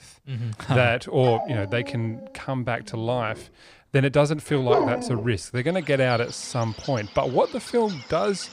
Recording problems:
animal sounds; loud; throughout; 7 dB below the speech

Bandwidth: 15 kHz